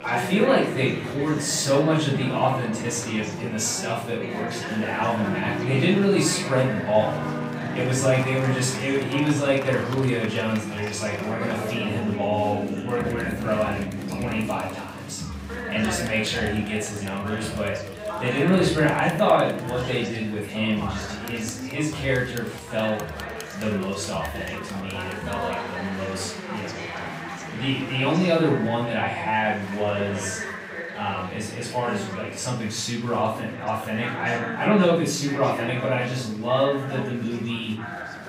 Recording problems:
off-mic speech; far
room echo; noticeable; dies away in 0.6 s
chatter from many people; loud; throughout; 9 dB below the speech
background music; noticeable; until 16 s; 10 dB below the speech

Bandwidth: 15.5 kHz